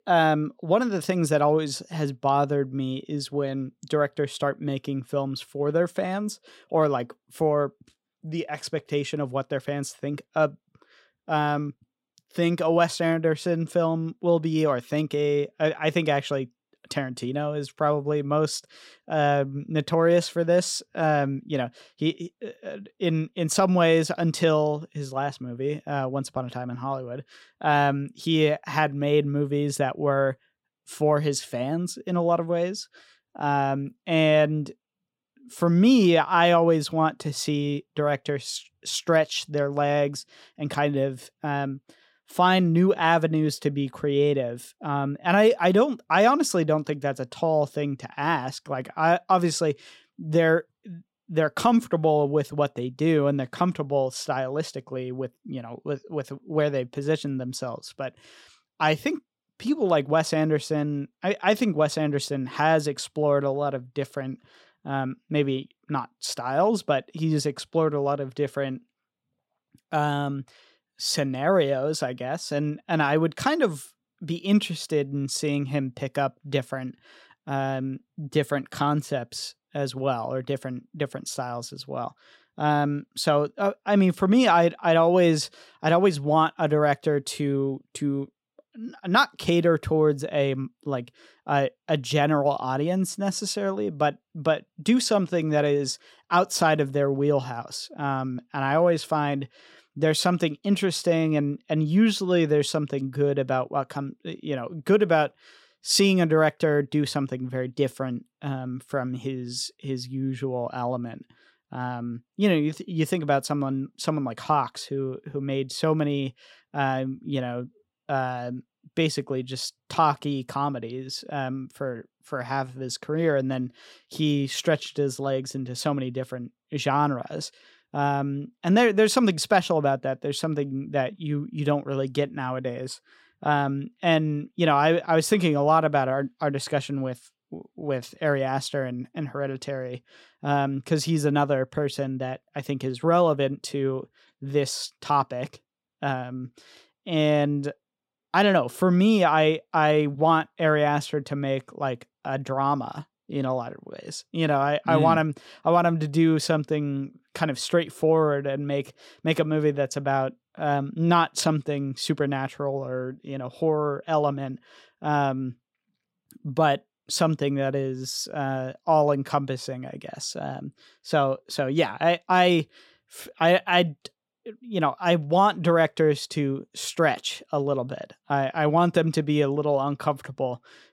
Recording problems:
none

